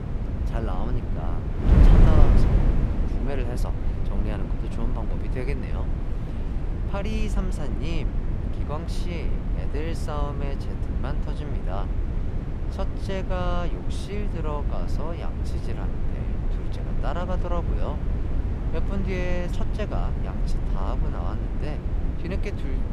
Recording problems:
wind noise on the microphone; heavy; 2 dB below the speech

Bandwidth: 13.5 kHz